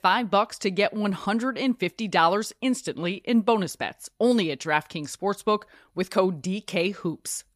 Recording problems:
none

